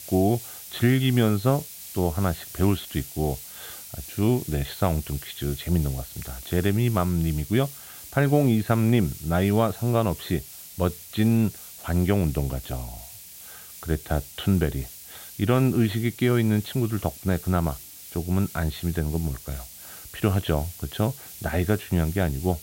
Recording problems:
high frequencies cut off; severe; nothing above 4.5 kHz
hiss; noticeable; throughout; 15 dB below the speech

